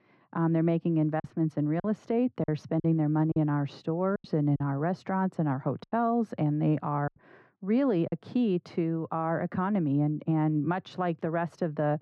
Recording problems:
muffled; very; fading above 3.5 kHz
choppy; very; from 1 to 3.5 s, at 4 s and from 6 to 8 s; 8% of the speech affected

